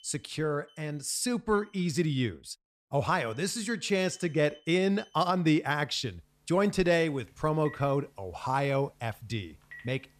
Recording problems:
alarms or sirens; faint; throughout; 25 dB below the speech

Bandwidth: 14 kHz